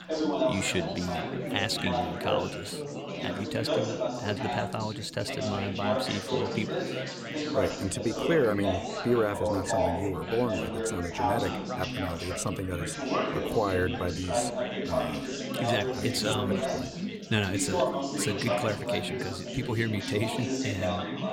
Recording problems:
chatter from many people; very loud; throughout; as loud as the speech

